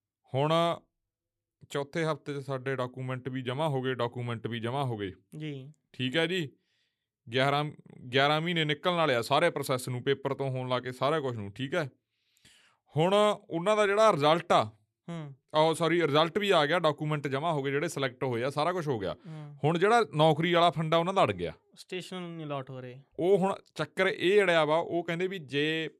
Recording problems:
none

